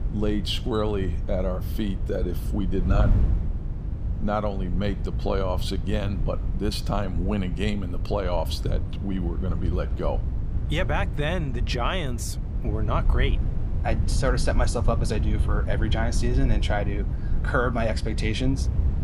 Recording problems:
wind noise on the microphone; occasional gusts; 10 dB below the speech

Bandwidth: 15 kHz